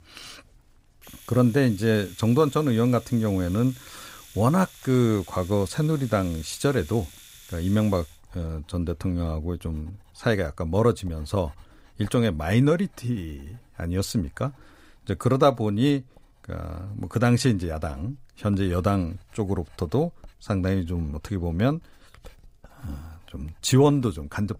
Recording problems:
household noises; faint; throughout; 25 dB below the speech

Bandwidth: 15.5 kHz